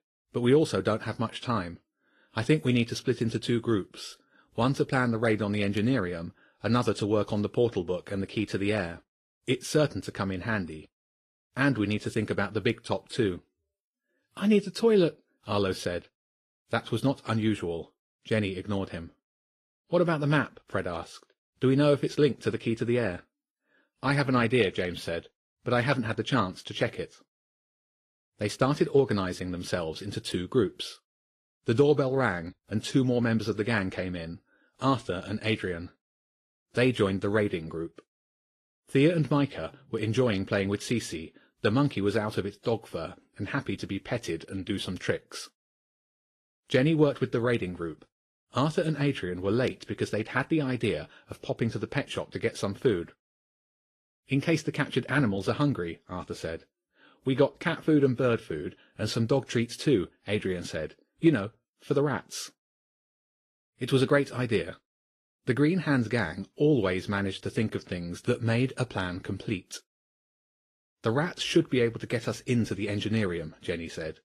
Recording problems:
garbled, watery; slightly; nothing above 13.5 kHz

